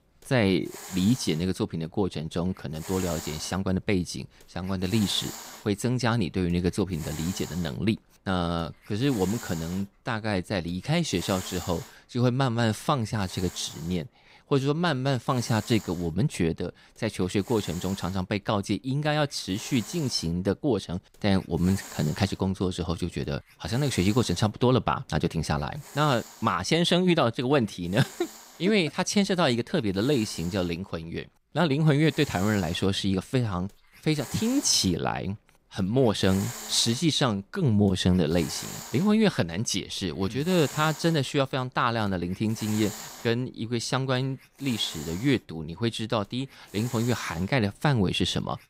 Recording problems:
hiss; noticeable; throughout; 15 dB below the speech

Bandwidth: 15.5 kHz